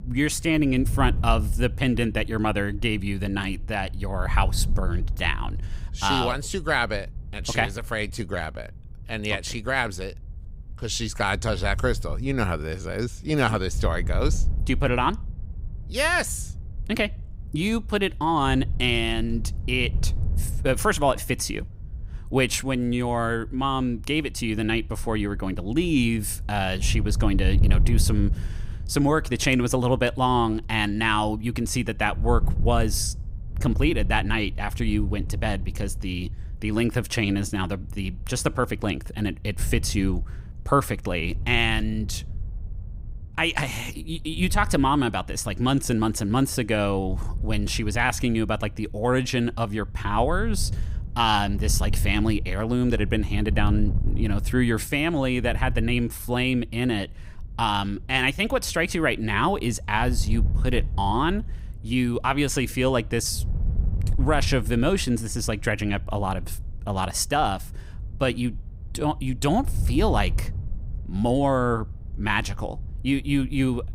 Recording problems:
wind noise on the microphone; occasional gusts; 20 dB below the speech

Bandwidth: 15.5 kHz